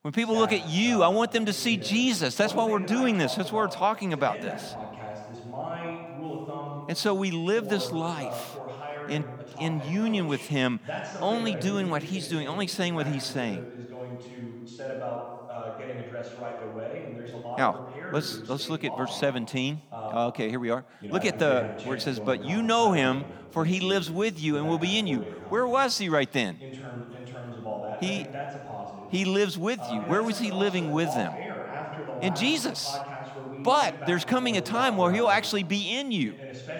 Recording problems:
voice in the background; noticeable; throughout; 10 dB below the speech

